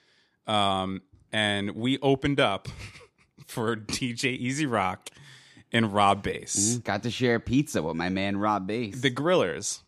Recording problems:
none

